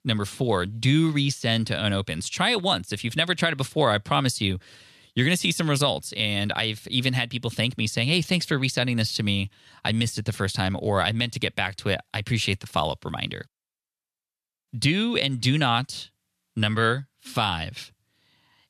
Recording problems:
none

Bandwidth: 13.5 kHz